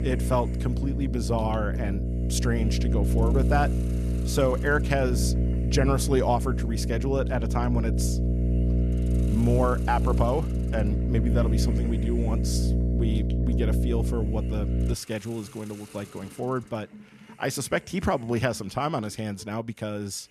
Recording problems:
electrical hum; loud; until 15 s; 60 Hz, 7 dB below the speech
hiss; noticeable; throughout; 20 dB below the speech

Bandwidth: 14 kHz